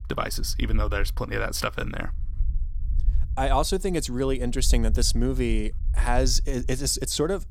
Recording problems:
low rumble; faint; throughout; 25 dB below the speech

